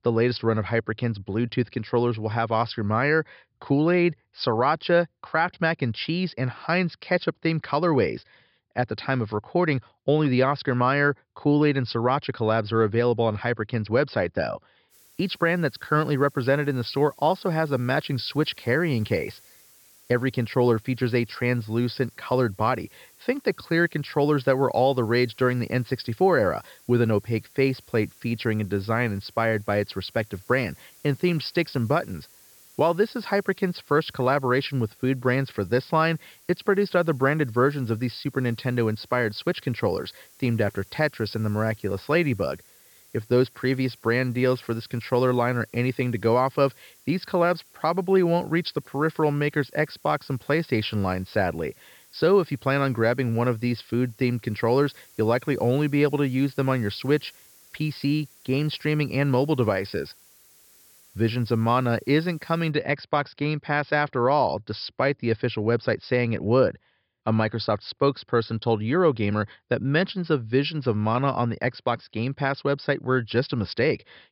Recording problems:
high frequencies cut off; noticeable; nothing above 5 kHz
hiss; faint; from 15 s to 1:03; 25 dB below the speech

